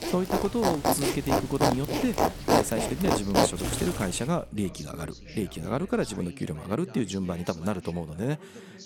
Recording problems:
household noises; very loud; until 4 s; 3 dB above the speech
rain or running water; noticeable; until 3 s; 15 dB below the speech
background chatter; noticeable; throughout; 2 voices, 15 dB below the speech
electrical hum; faint; from 3 to 6.5 s; 60 Hz, 30 dB below the speech

